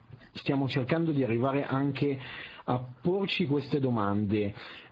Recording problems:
garbled, watery; badly
squashed, flat; heavily

